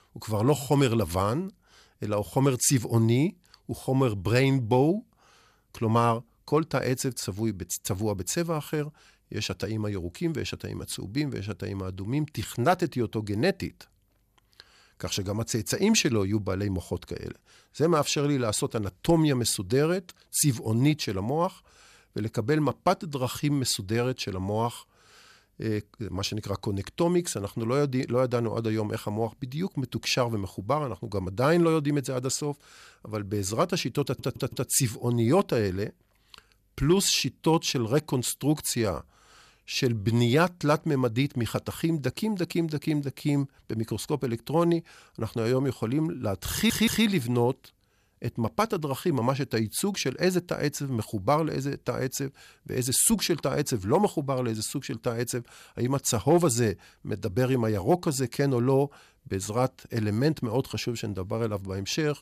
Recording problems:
audio stuttering; at 34 s and at 47 s

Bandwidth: 14.5 kHz